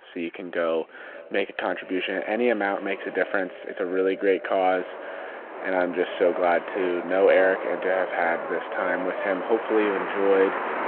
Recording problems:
echo of what is said; noticeable; throughout; 480 ms later, 15 dB below the speech
phone-call audio
traffic noise; loud; throughout; 9 dB below the speech

